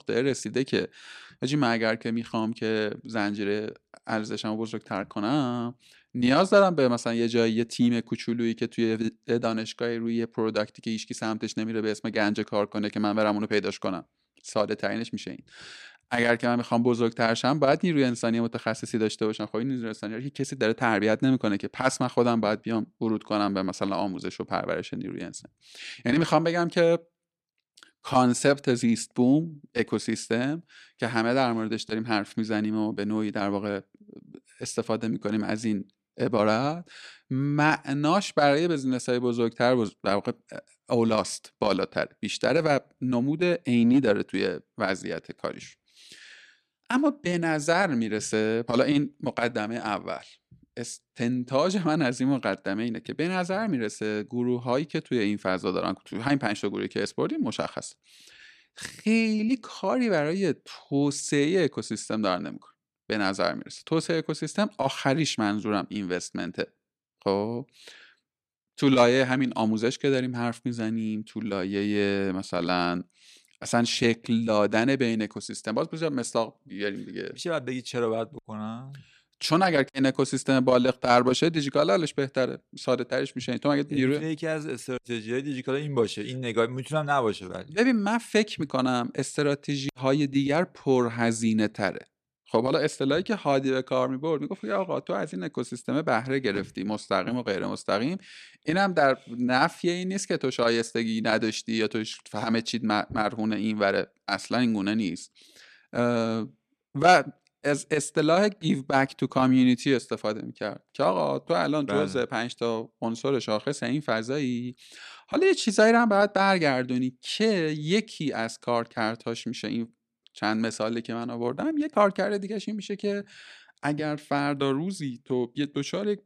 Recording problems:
none

